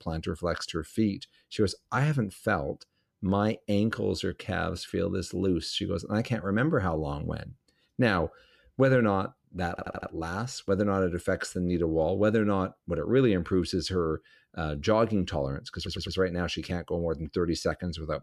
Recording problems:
audio stuttering; at 9.5 s and at 16 s

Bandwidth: 14.5 kHz